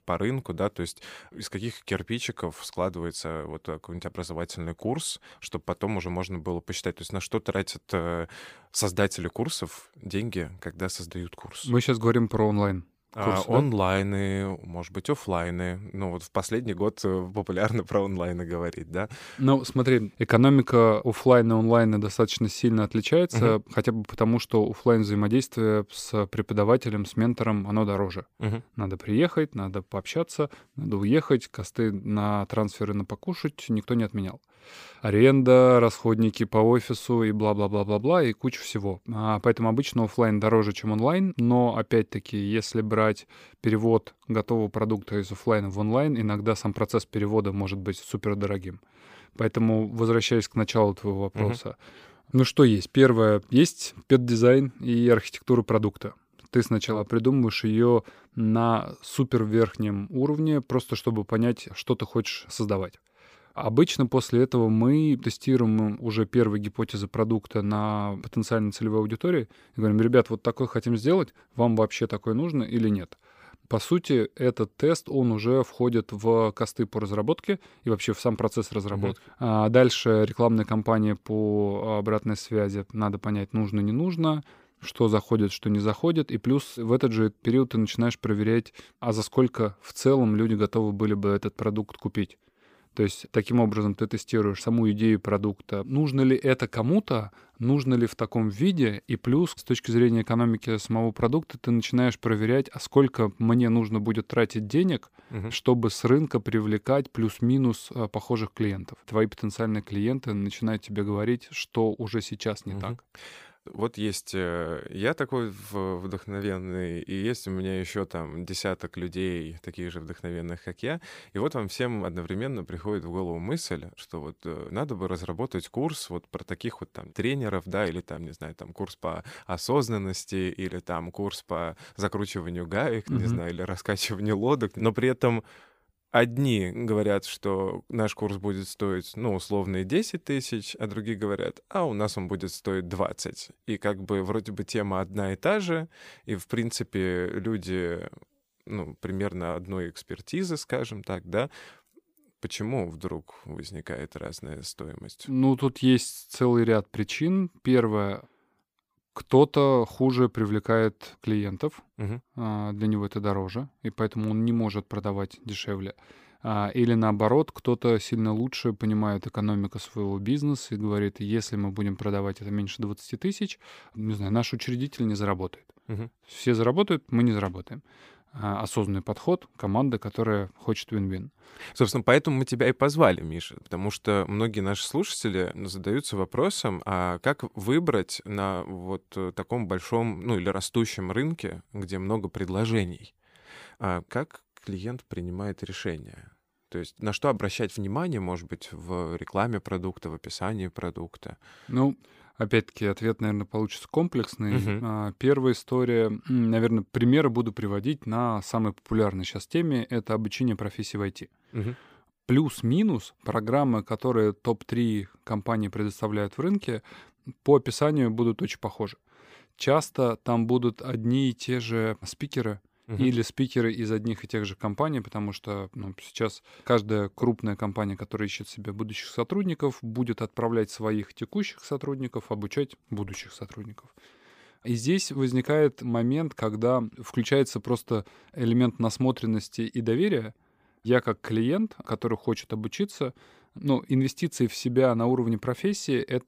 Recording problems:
none

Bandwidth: 15 kHz